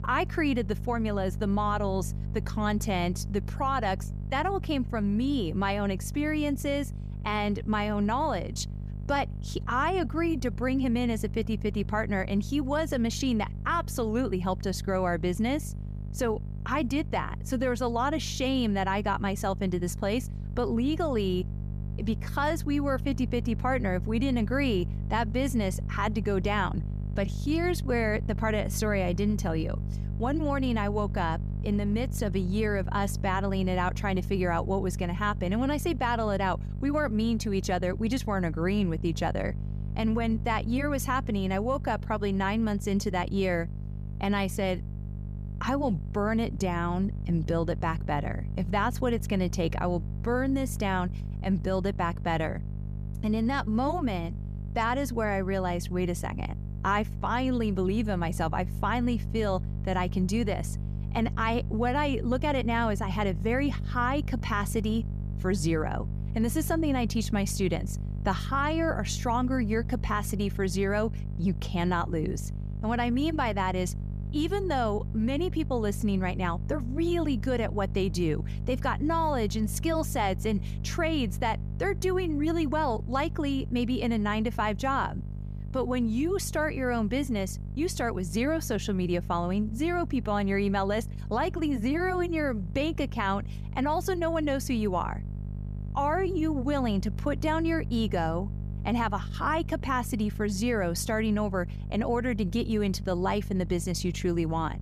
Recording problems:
electrical hum; noticeable; throughout; 50 Hz, 20 dB below the speech

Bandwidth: 14.5 kHz